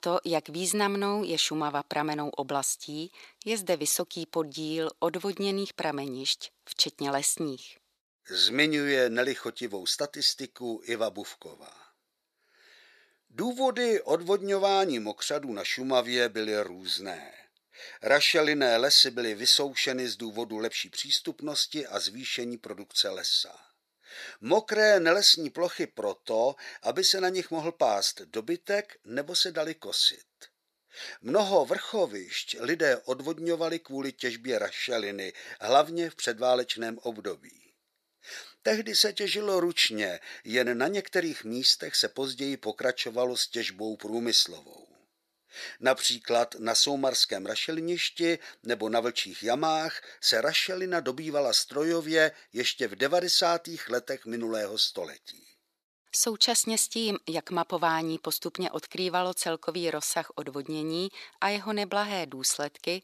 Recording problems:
thin; somewhat; fading below 450 Hz

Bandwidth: 14 kHz